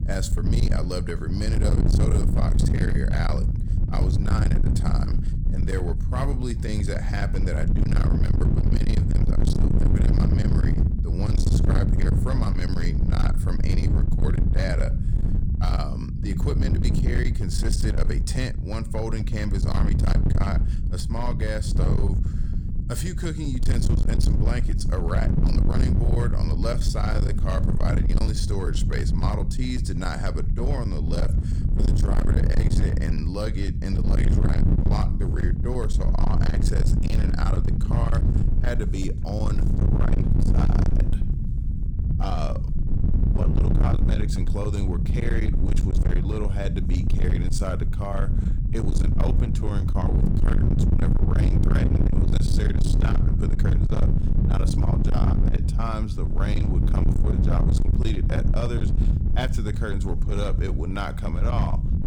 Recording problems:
distortion; heavy; 28% of the sound clipped
low rumble; loud; throughout; 2 dB below the speech

